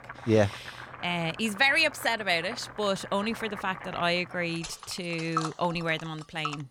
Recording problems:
household noises; noticeable; throughout; 15 dB below the speech

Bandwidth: 17.5 kHz